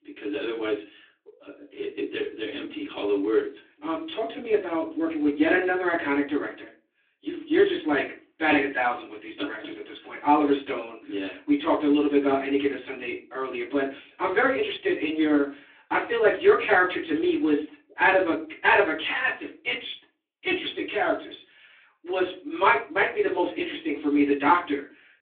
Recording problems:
off-mic speech; far
room echo; slight; dies away in 0.3 s
phone-call audio; nothing above 3.5 kHz

